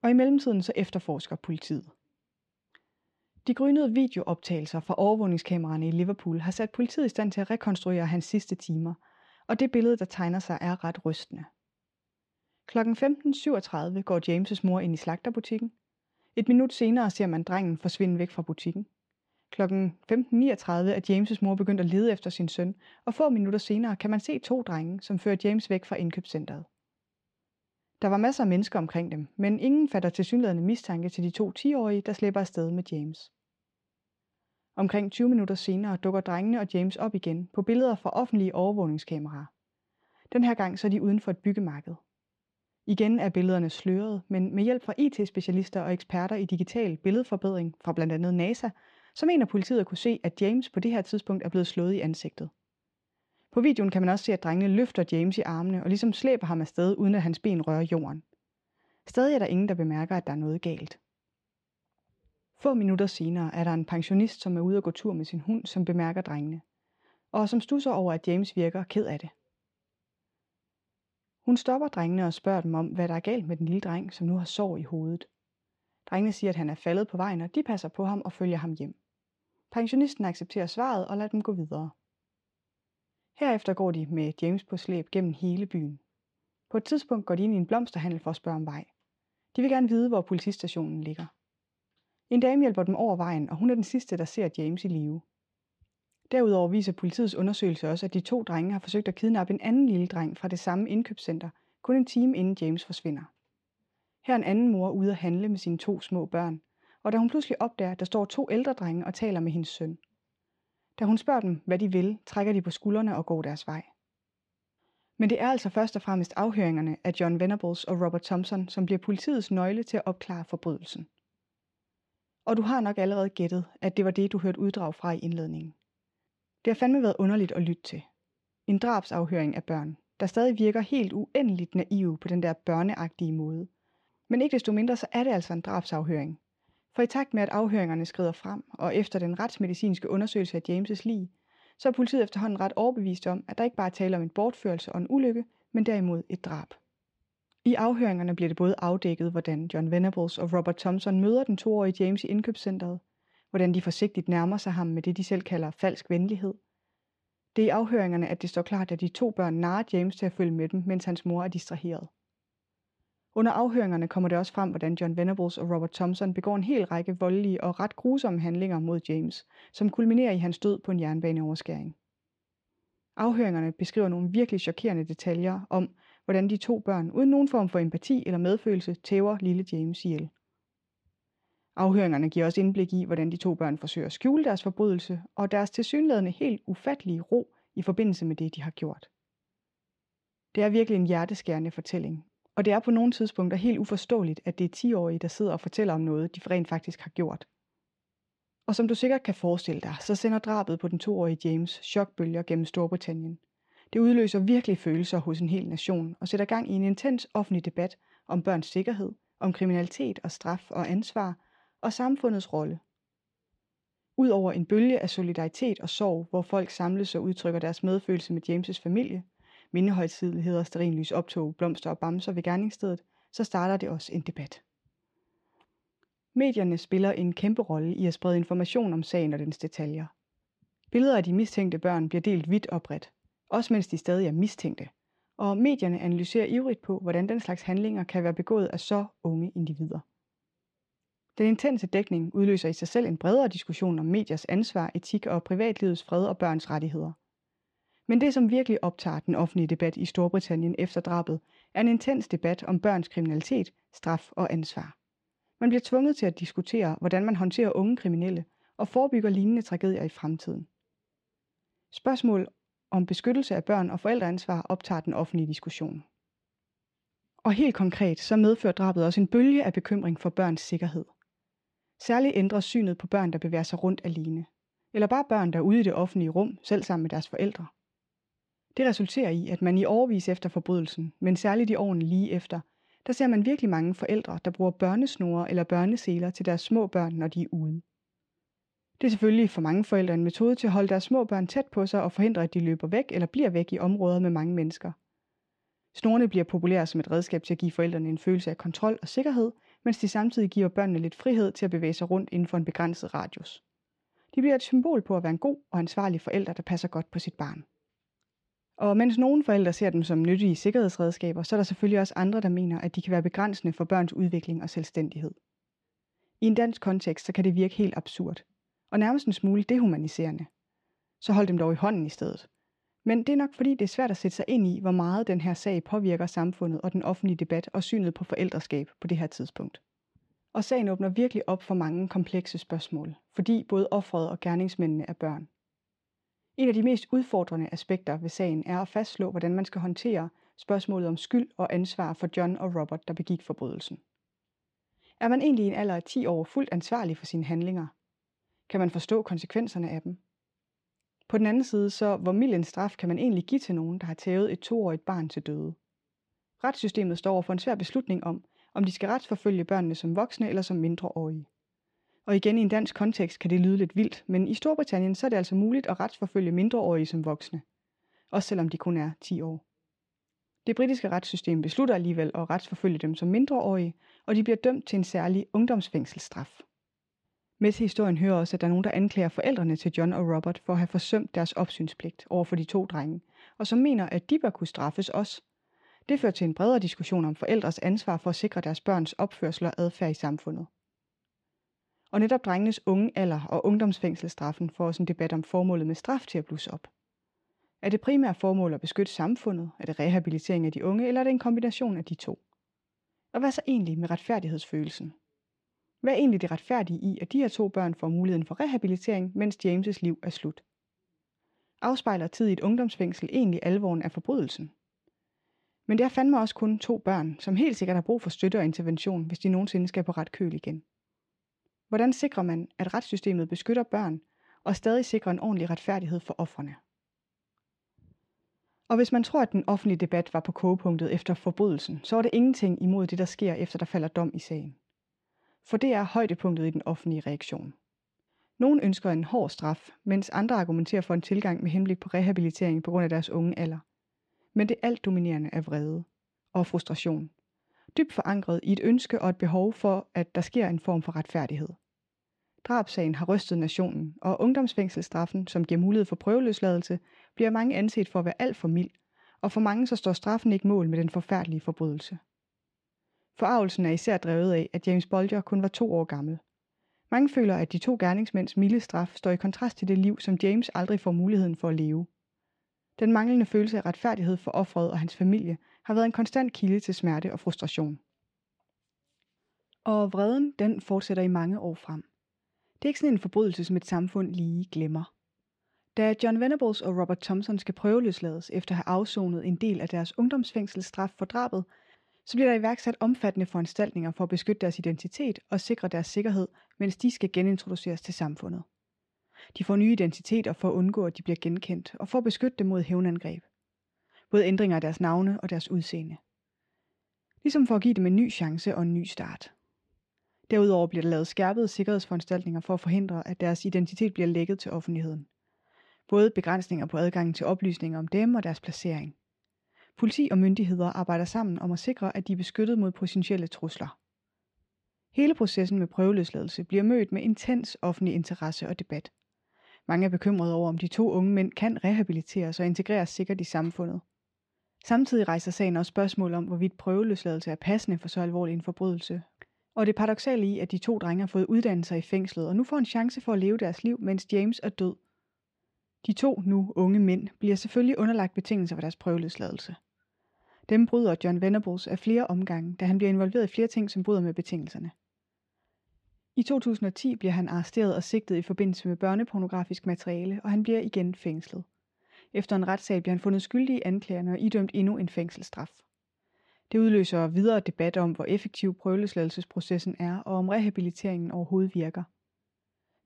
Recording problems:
muffled; slightly; fading above 4 kHz

